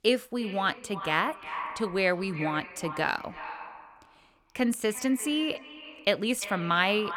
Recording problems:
echo of what is said; noticeable; throughout; 340 ms later, 10 dB below the speech

